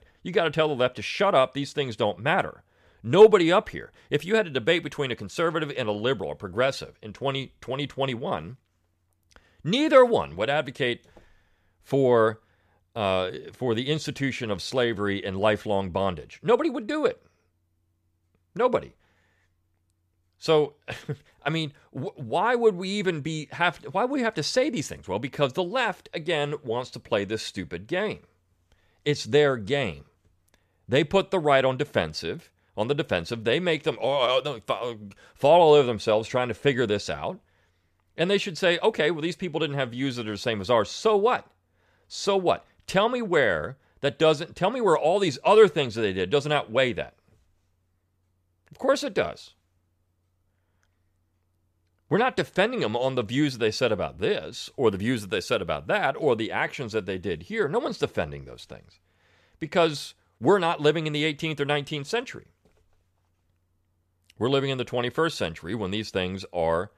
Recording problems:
none

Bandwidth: 14.5 kHz